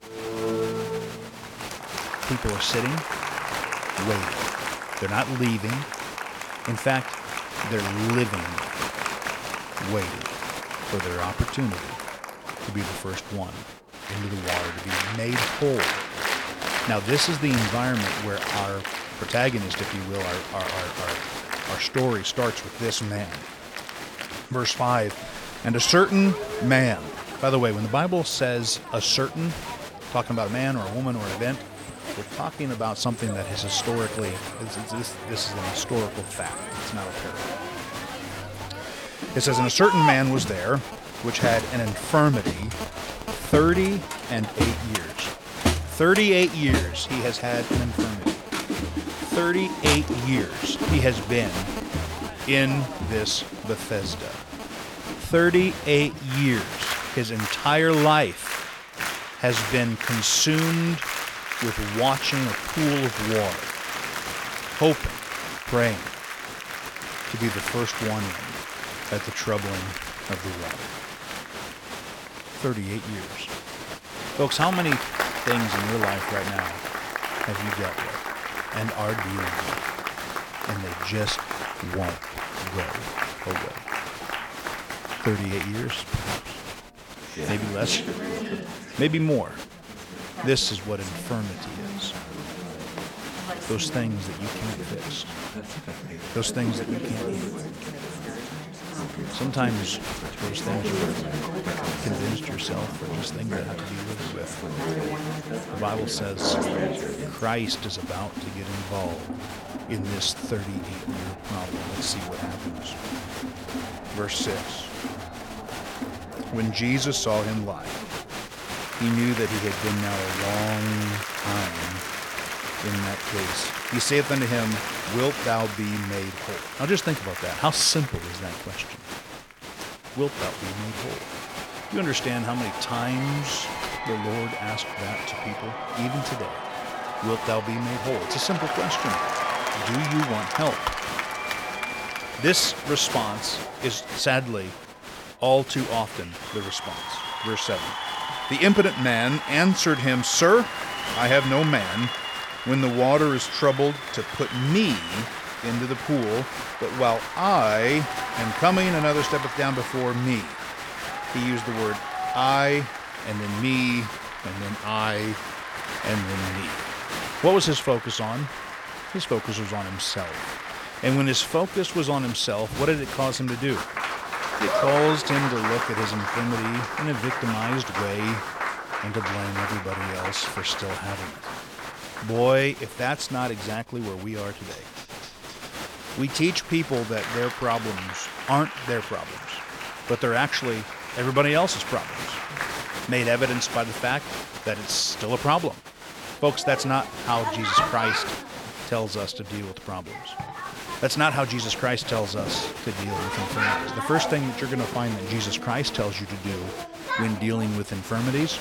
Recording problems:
crowd noise; loud; throughout; 5 dB below the speech

